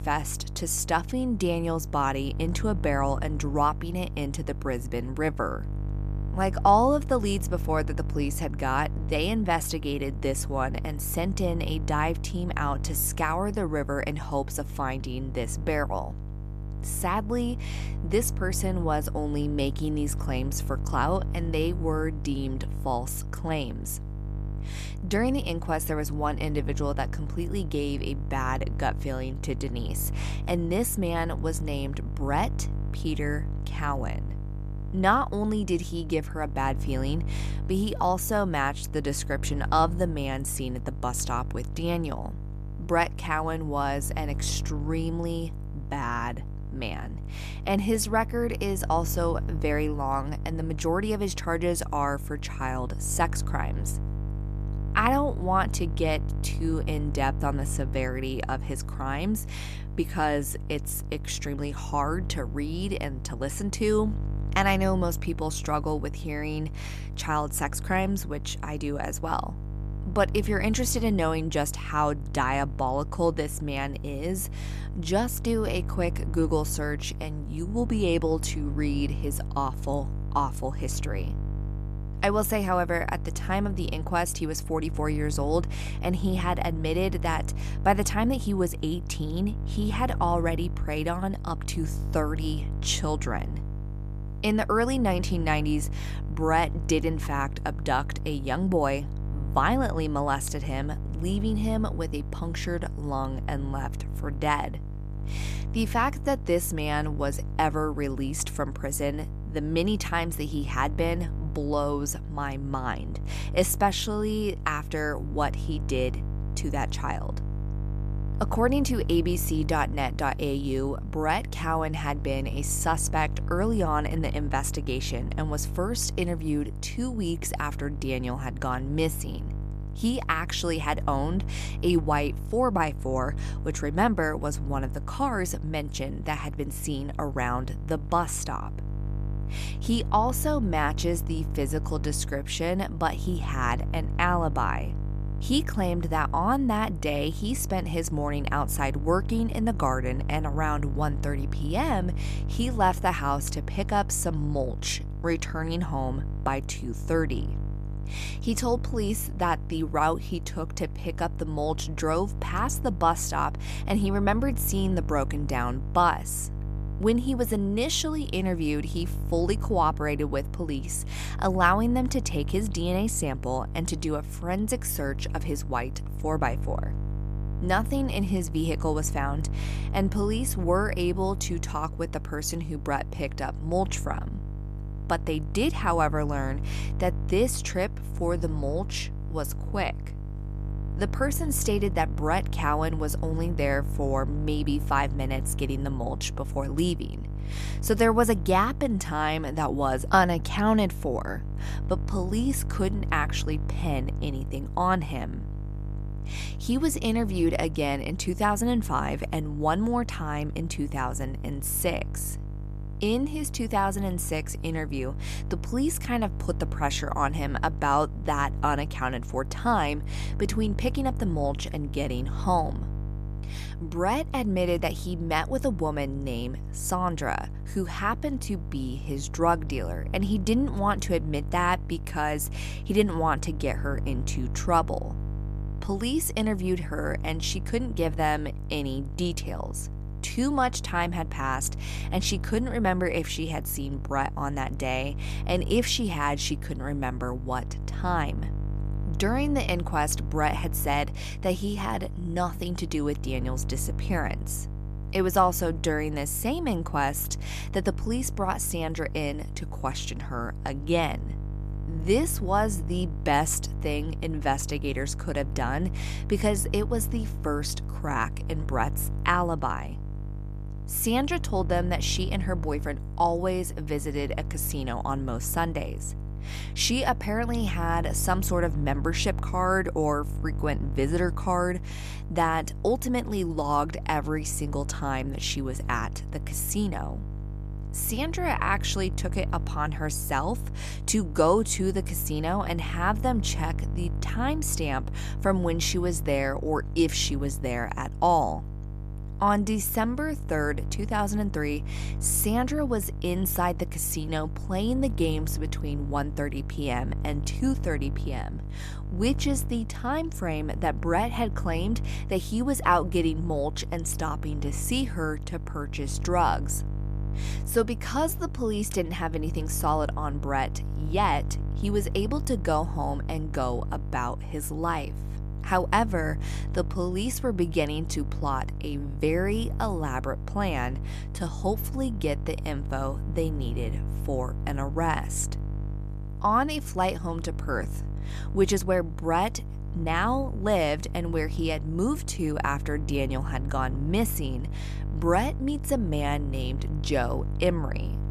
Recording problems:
electrical hum; noticeable; throughout; 50 Hz, 20 dB below the speech

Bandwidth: 14 kHz